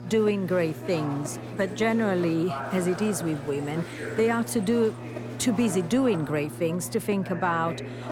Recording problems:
electrical hum; noticeable; throughout; 60 Hz, 15 dB below the speech
murmuring crowd; noticeable; throughout; 10 dB below the speech

